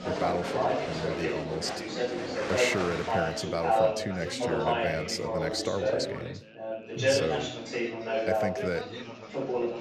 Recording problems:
chatter from many people; very loud; throughout; 3 dB above the speech

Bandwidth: 15 kHz